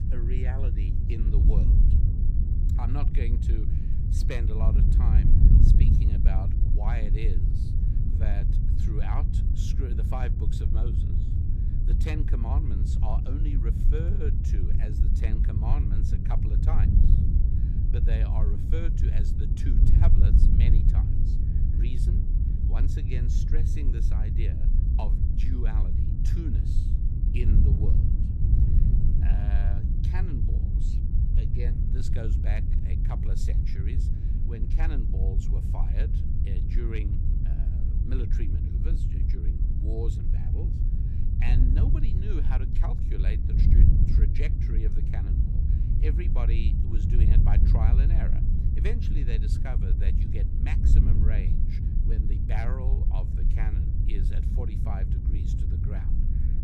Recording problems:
wind noise on the microphone; heavy; 1 dB above the speech

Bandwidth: 15.5 kHz